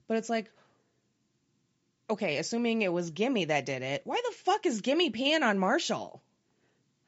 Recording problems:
high frequencies cut off; noticeable; nothing above 8 kHz

